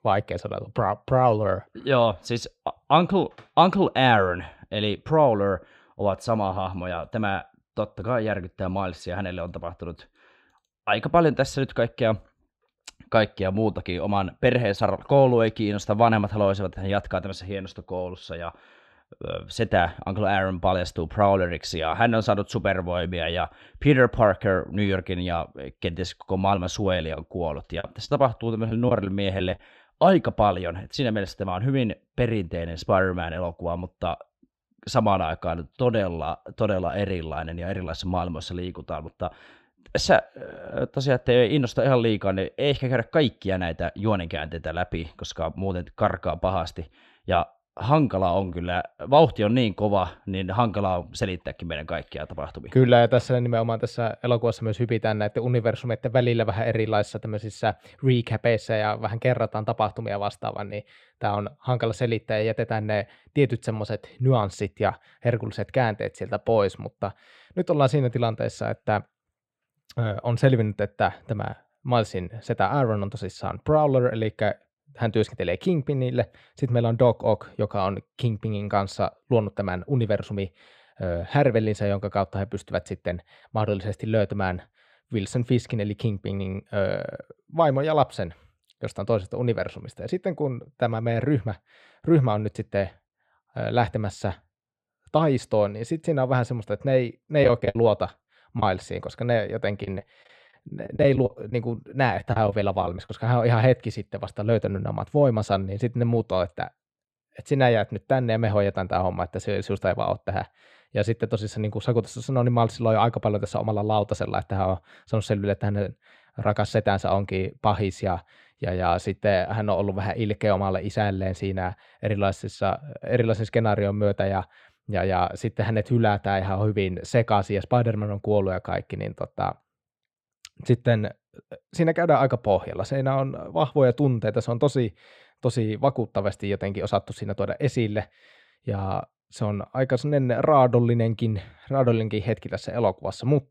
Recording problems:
muffled; slightly; fading above 3.5 kHz
choppy; very; from 28 to 30 s, from 1:37 to 1:39 and from 1:40 to 1:43; 11% of the speech affected

